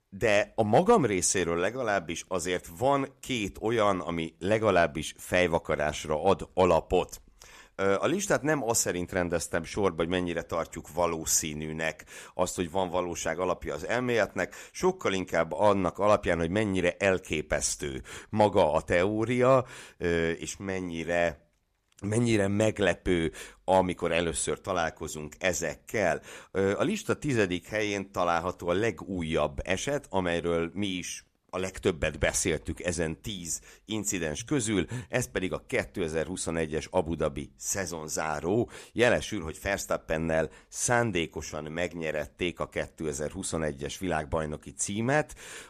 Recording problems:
none

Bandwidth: 14.5 kHz